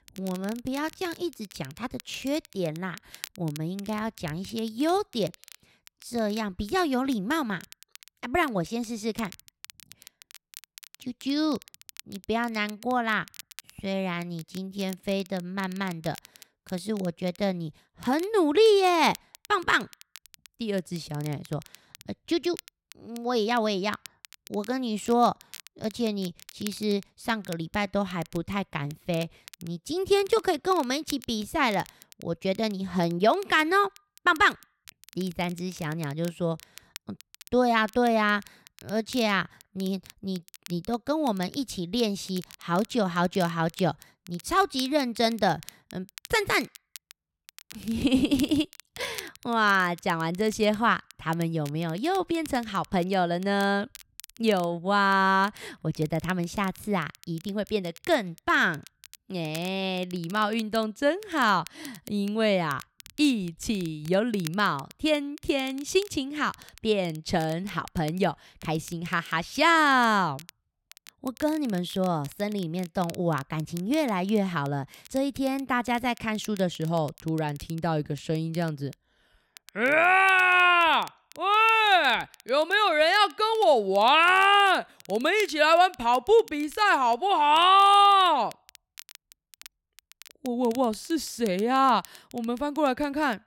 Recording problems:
crackle, like an old record; faint; 20 dB below the speech

